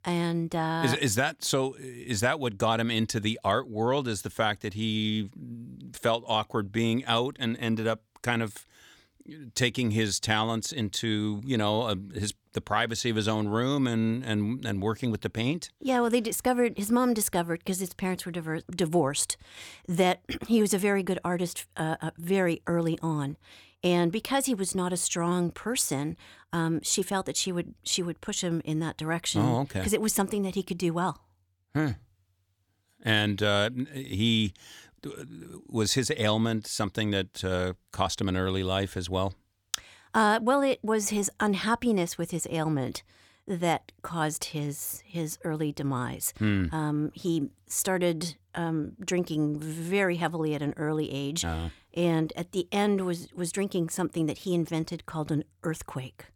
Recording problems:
none

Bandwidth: 18.5 kHz